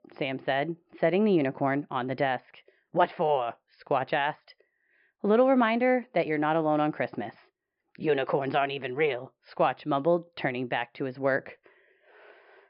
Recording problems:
high frequencies cut off; noticeable; nothing above 5.5 kHz
muffled; very slightly; fading above 2 kHz

